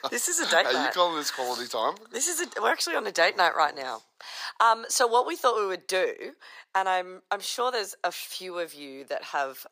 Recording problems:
thin; very; fading below 800 Hz

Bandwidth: 15 kHz